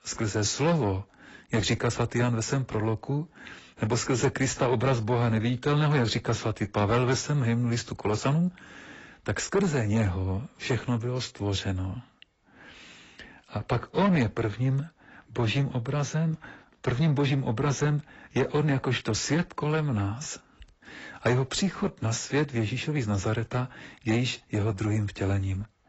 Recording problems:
garbled, watery; badly; nothing above 7.5 kHz
distortion; slight; 10 dB below the speech

